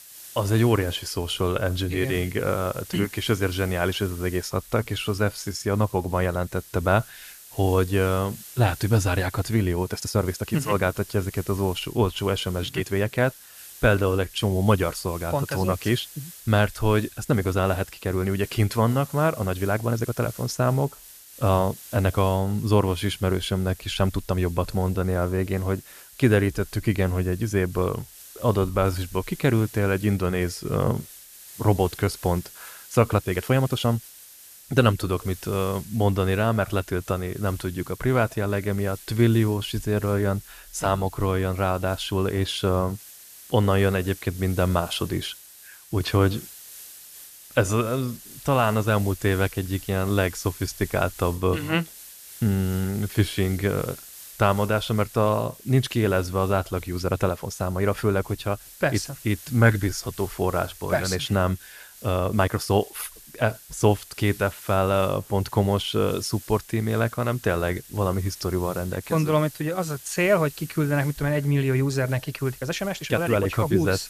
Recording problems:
hiss; noticeable; throughout; 15 dB below the speech
uneven, jittery; strongly; from 4.5 s to 1:13

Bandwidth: 14.5 kHz